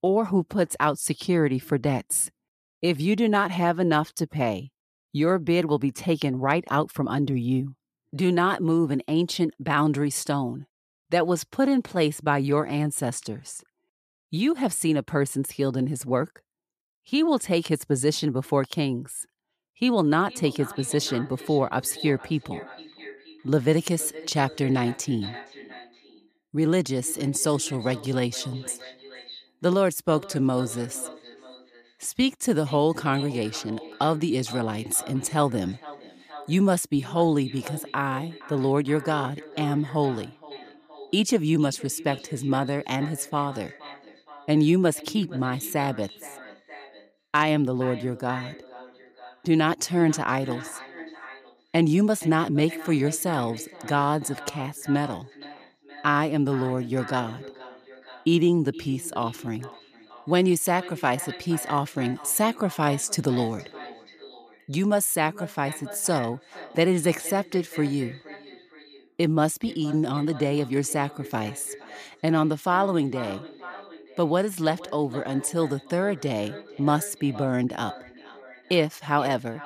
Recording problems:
echo of what is said; noticeable; from 20 s on; 470 ms later, 15 dB below the speech

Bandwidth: 14.5 kHz